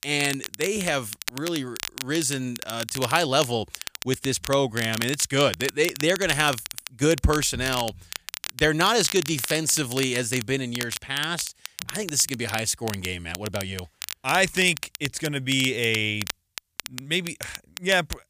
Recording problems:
crackle, like an old record; noticeable; 10 dB below the speech

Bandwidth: 15 kHz